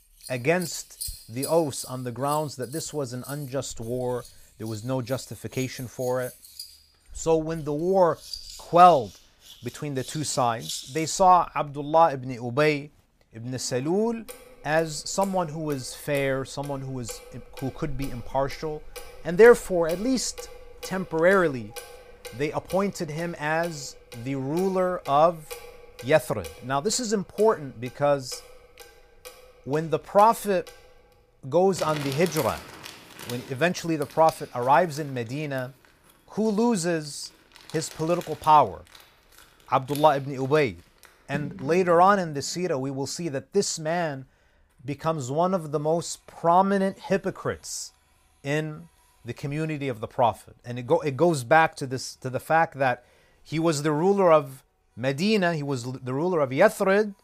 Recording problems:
household noises; noticeable; throughout; 20 dB below the speech

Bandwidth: 15 kHz